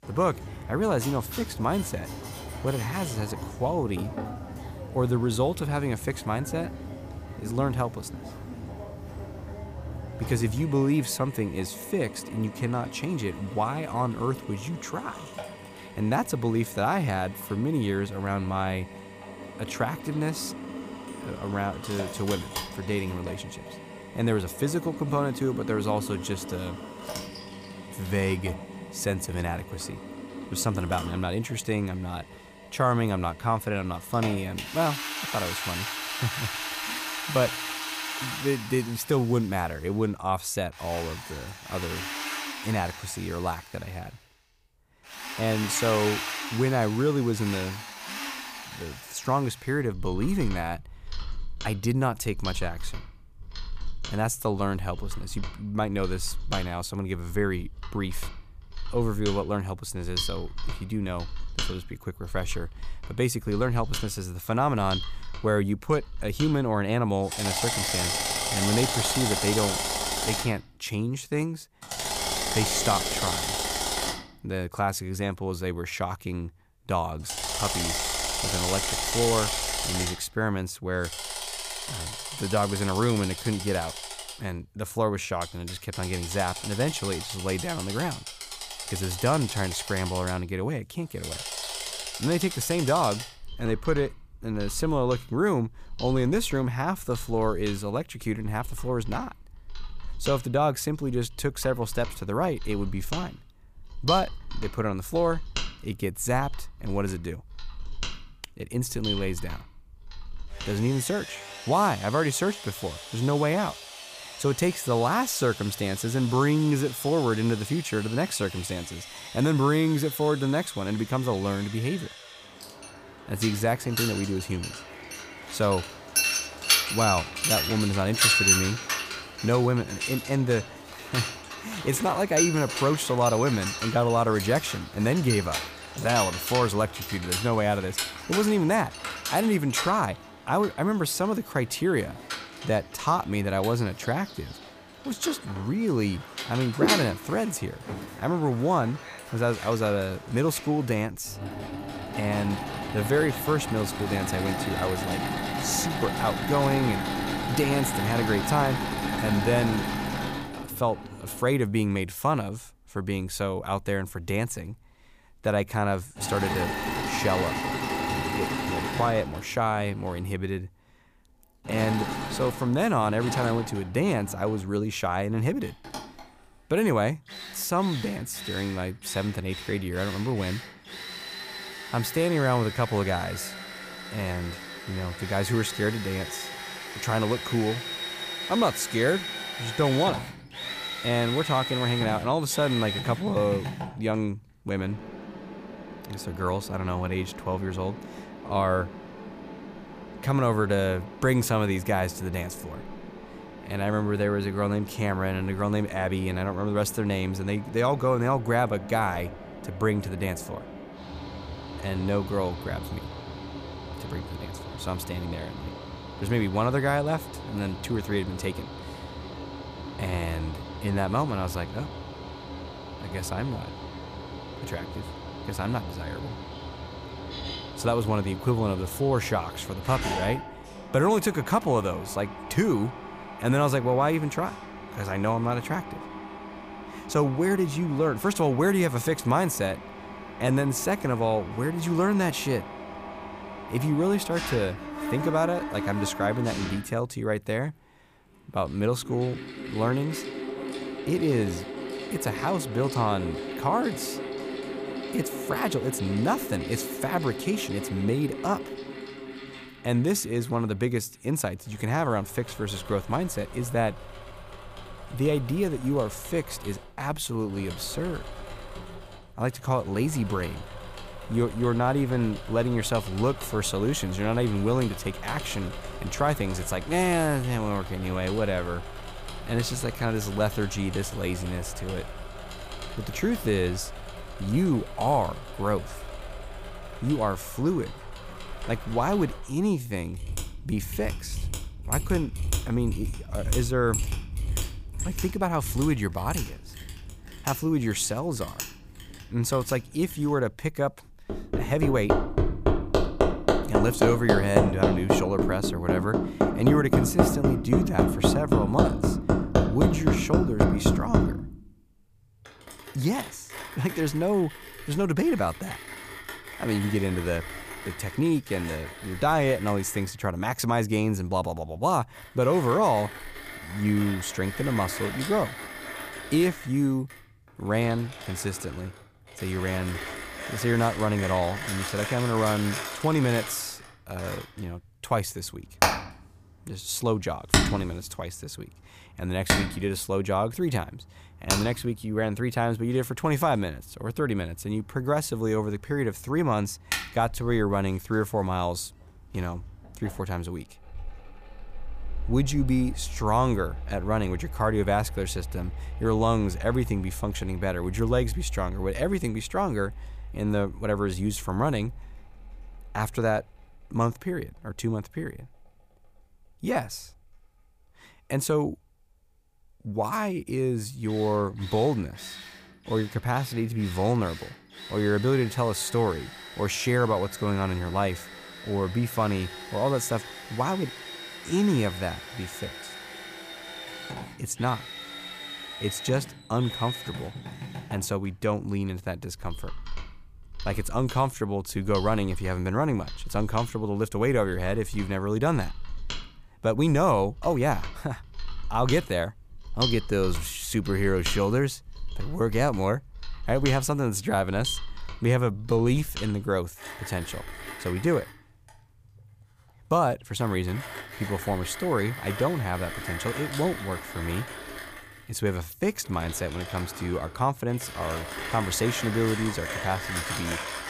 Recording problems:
machinery noise; loud; throughout; 6 dB below the speech

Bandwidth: 15 kHz